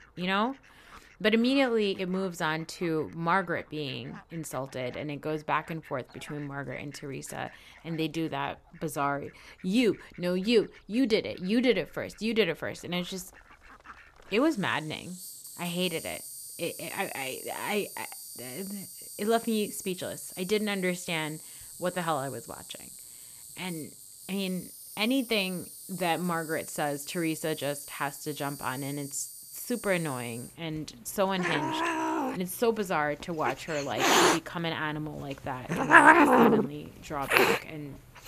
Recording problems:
animal sounds; very loud; throughout; 2 dB above the speech

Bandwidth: 14.5 kHz